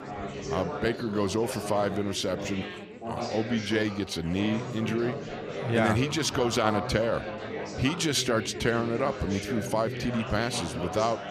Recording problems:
chatter from many people; loud; throughout; 7 dB below the speech

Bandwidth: 14.5 kHz